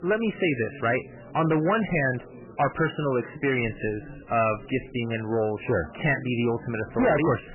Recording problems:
distortion; heavy; 8% of the sound clipped
garbled, watery; badly; nothing above 3 kHz
chatter from many people; noticeable; throughout; 20 dB below the speech

